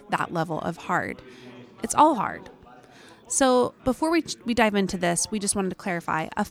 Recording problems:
background chatter; faint; throughout; 3 voices, 25 dB below the speech

